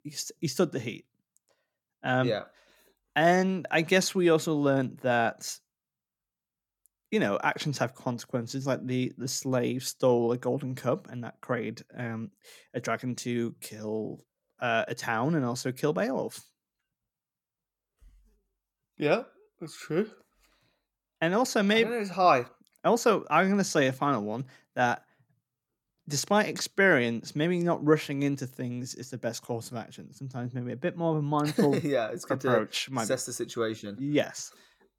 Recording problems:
none

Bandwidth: 17 kHz